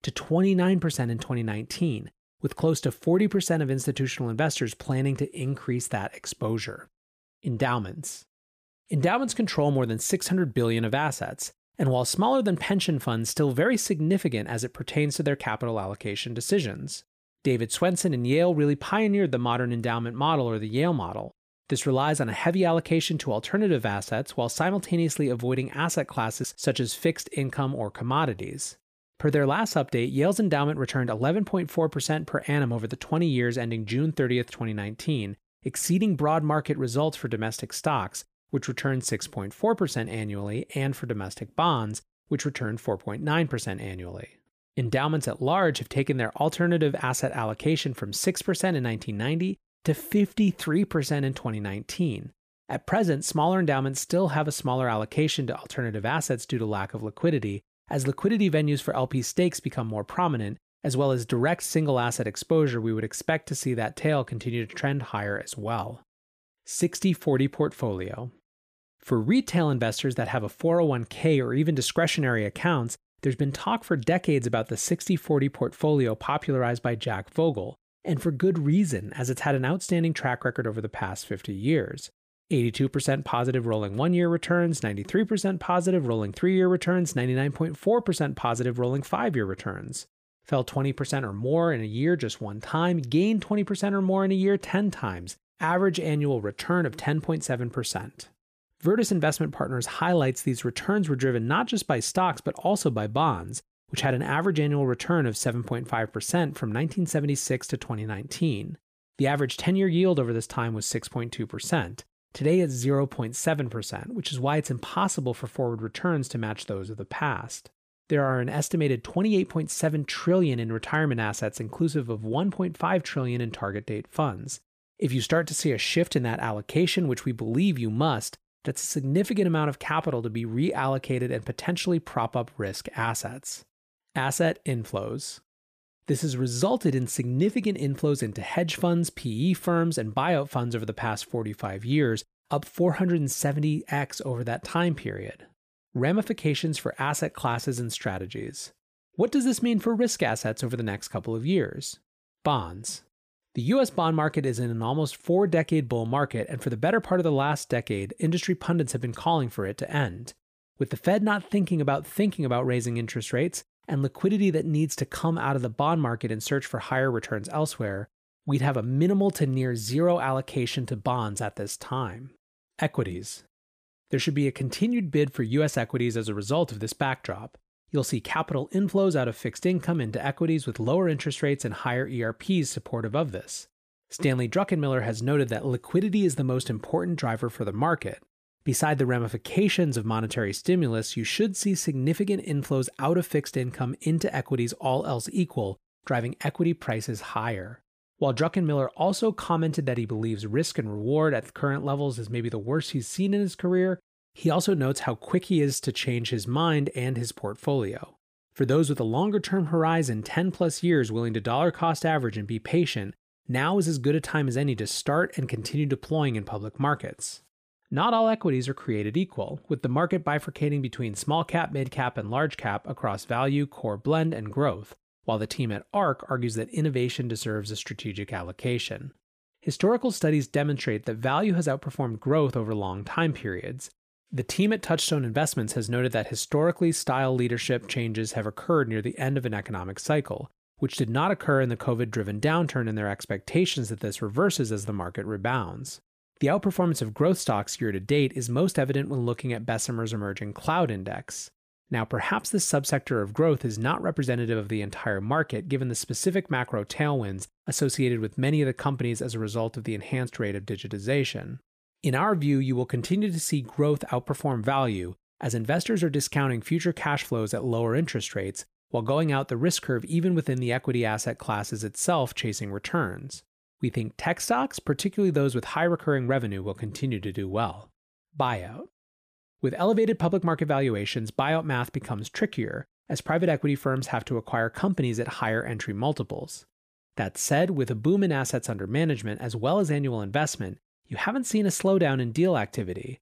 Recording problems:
none

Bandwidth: 15 kHz